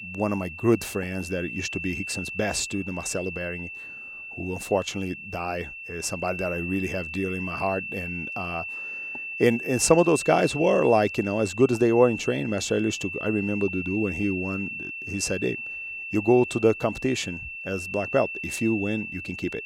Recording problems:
high-pitched whine; loud; throughout; 2.5 kHz, 7 dB below the speech

